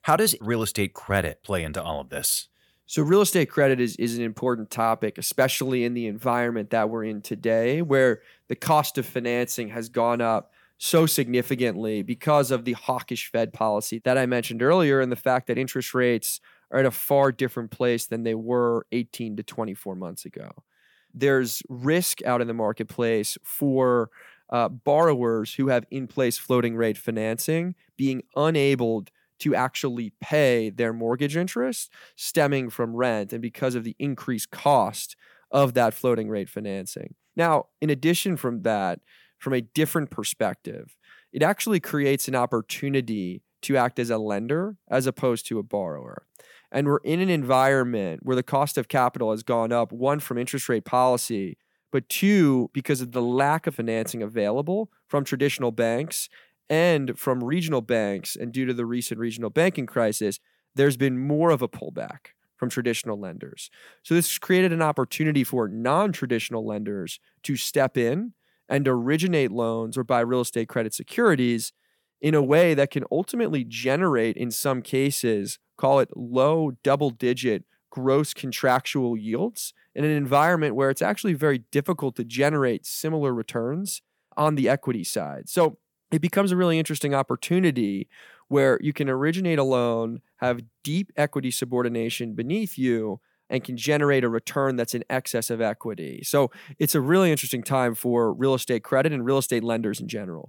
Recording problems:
none

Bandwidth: 18 kHz